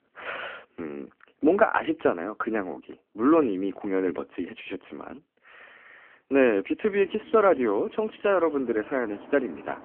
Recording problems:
phone-call audio; poor line
traffic noise; faint; from 7 s on; 20 dB below the speech

